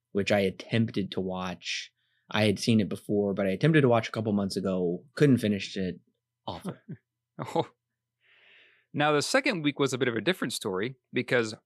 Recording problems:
none

